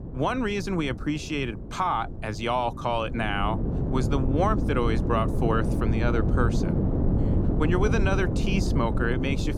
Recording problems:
wind noise on the microphone; heavy; 7 dB below the speech

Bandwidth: 17.5 kHz